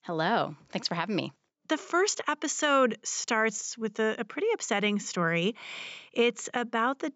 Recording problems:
high frequencies cut off; noticeable; nothing above 8 kHz

